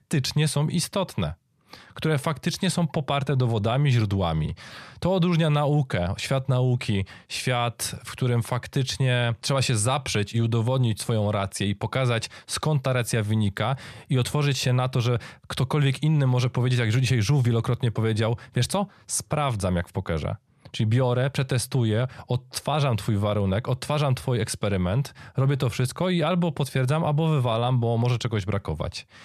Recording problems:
none

